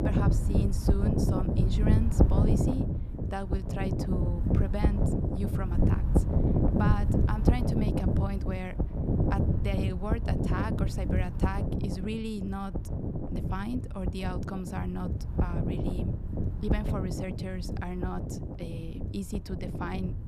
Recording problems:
wind noise on the microphone; heavy; 1 dB above the speech

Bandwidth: 14.5 kHz